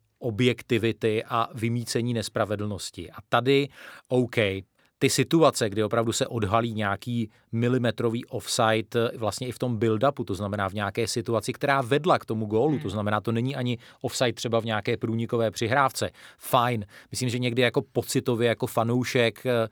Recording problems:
none

